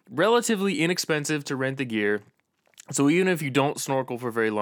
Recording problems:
abrupt cut into speech; at the end

